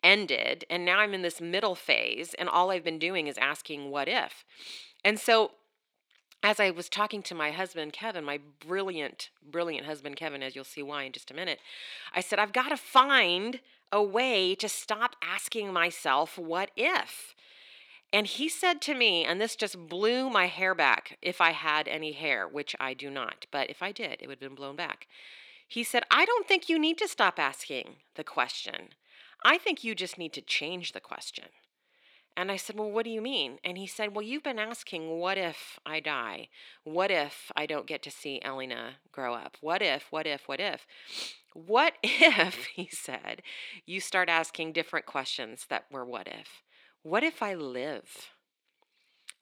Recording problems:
thin; somewhat; fading below 300 Hz

